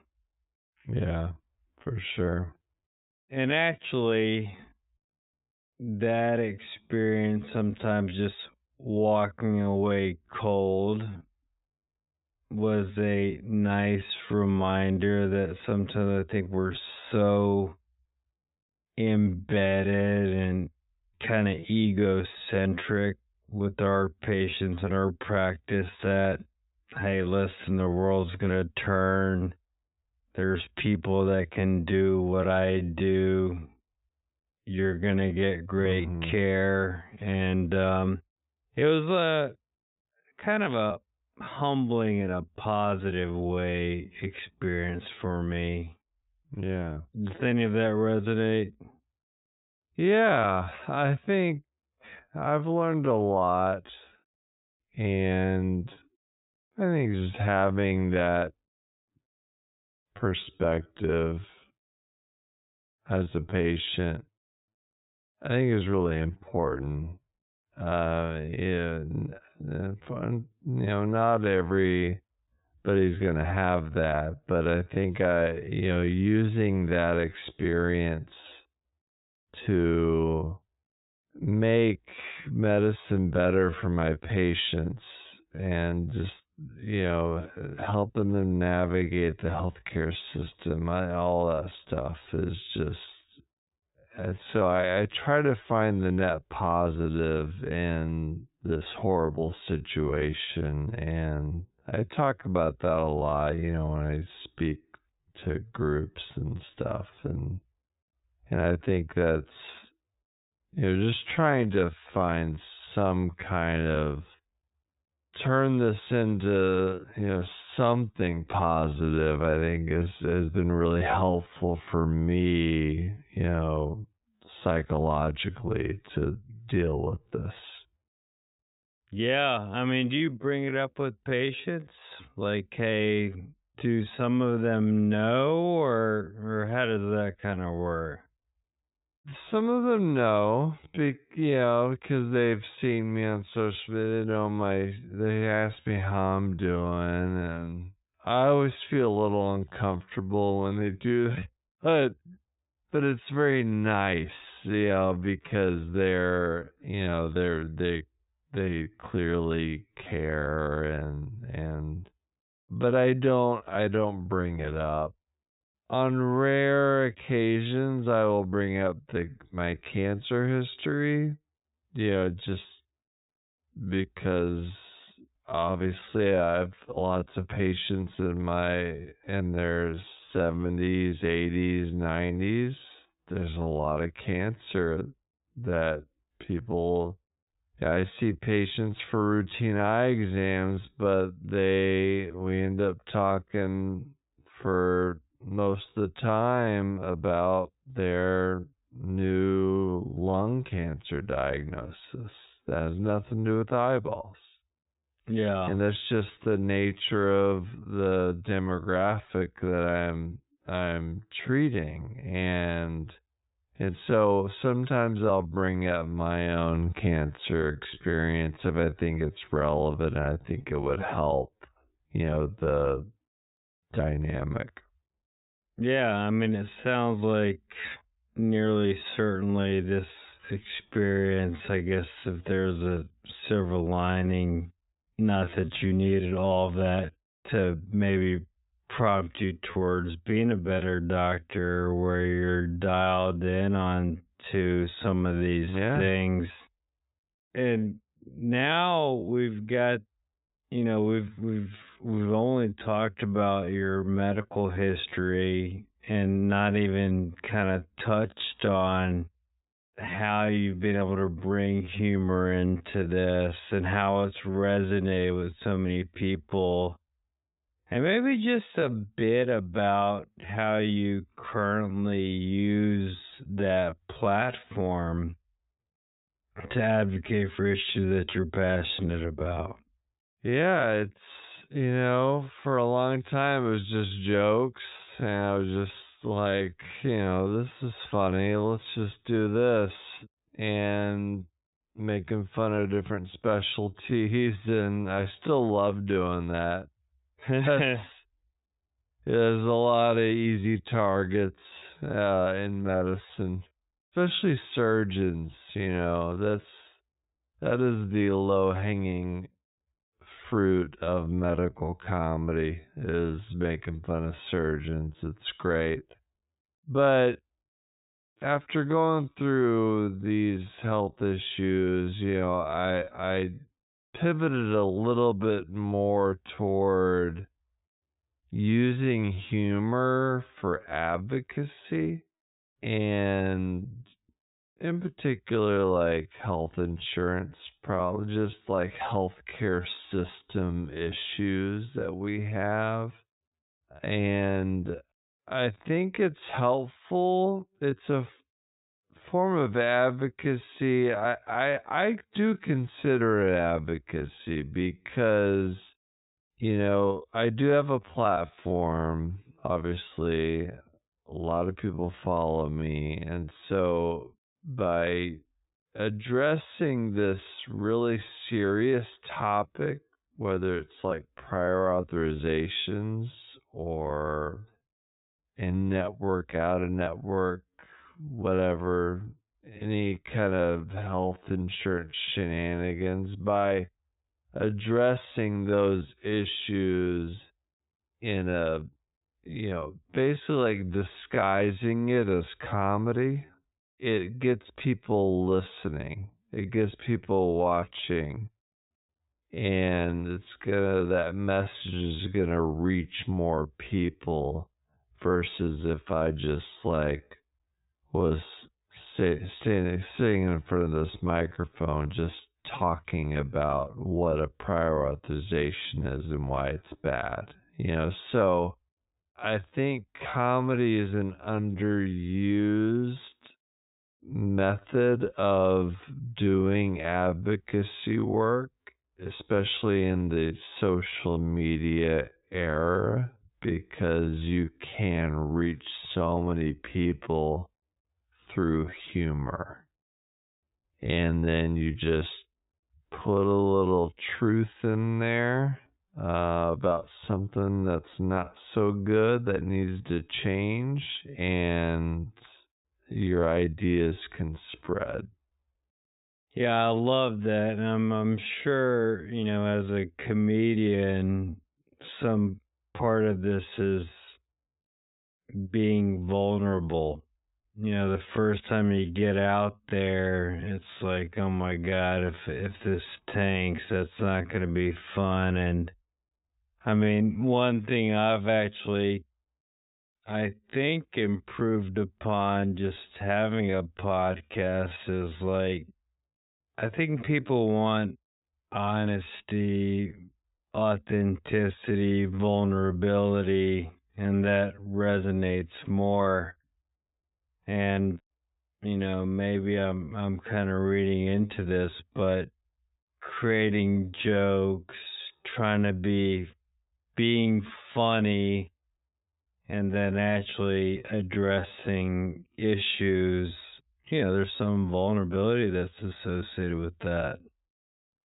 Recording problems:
high frequencies cut off; severe; nothing above 4 kHz
wrong speed, natural pitch; too slow; 0.6 times normal speed

